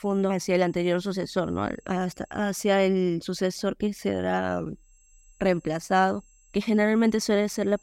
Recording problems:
high-pitched whine; faint; until 2.5 s and from 5 s on; 7.5 kHz, 35 dB below the speech

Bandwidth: 16 kHz